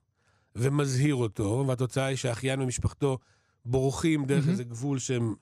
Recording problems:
none

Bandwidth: 15 kHz